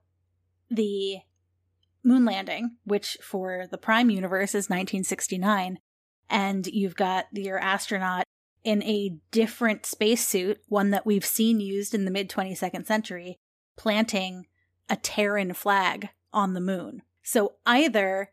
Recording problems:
none

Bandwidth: 14.5 kHz